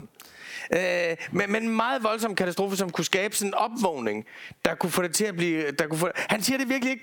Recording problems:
squashed, flat; heavily

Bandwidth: 18 kHz